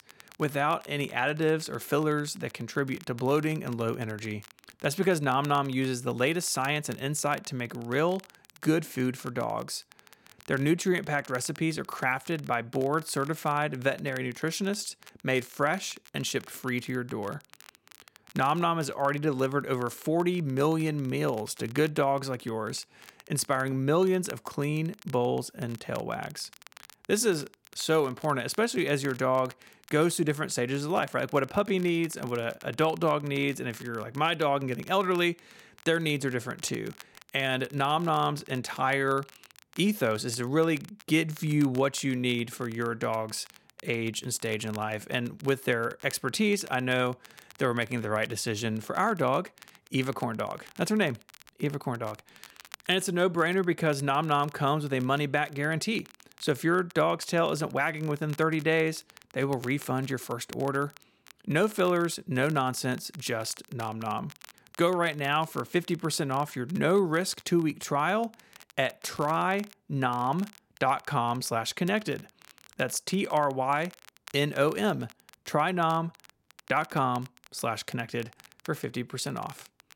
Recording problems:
crackle, like an old record; faint; 25 dB below the speech

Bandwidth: 16.5 kHz